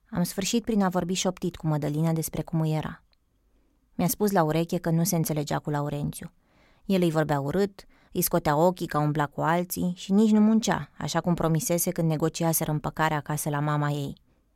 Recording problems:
none

